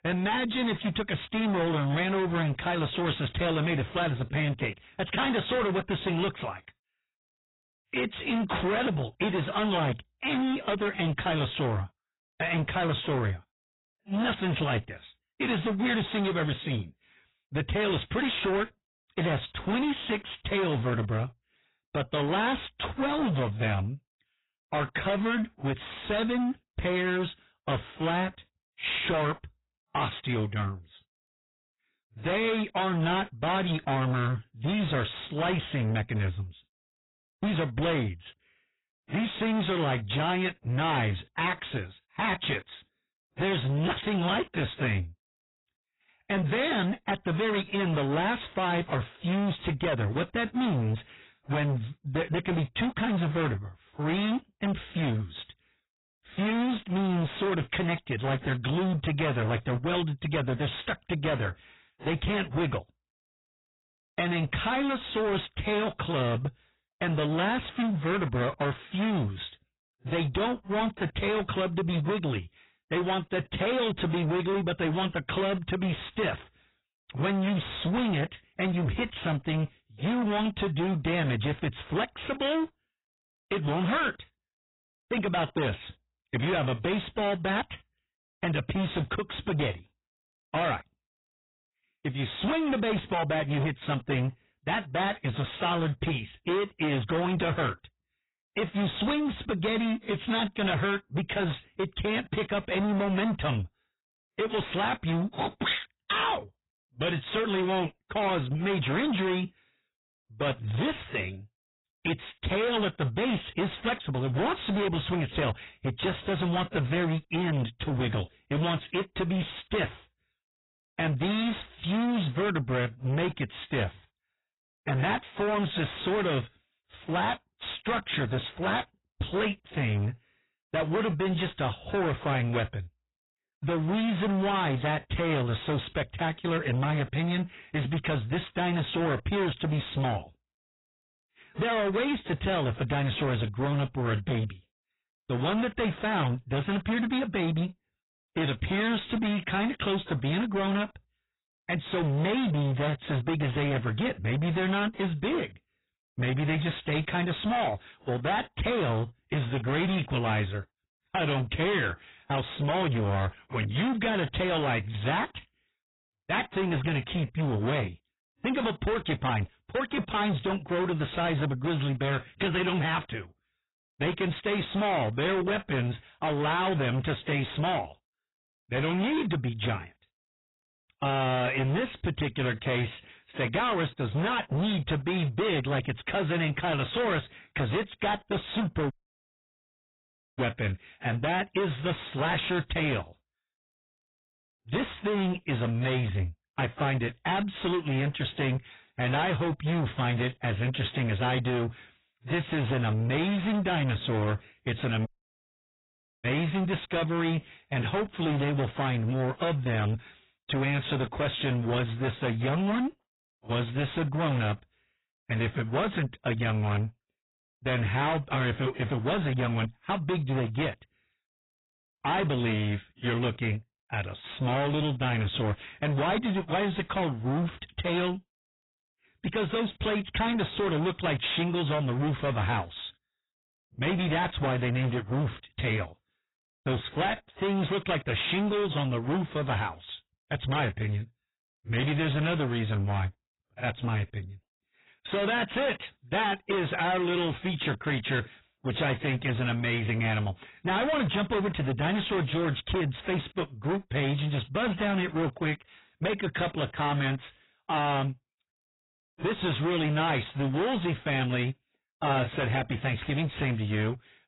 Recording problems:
distortion; heavy; 27% of the sound clipped
garbled, watery; badly; nothing above 4 kHz
audio cutting out; at 3:09 for 1.5 s and at 3:25 for 1 s

